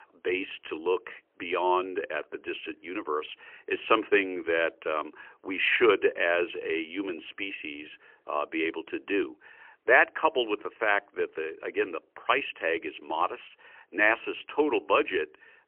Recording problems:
phone-call audio; poor line; nothing above 3 kHz

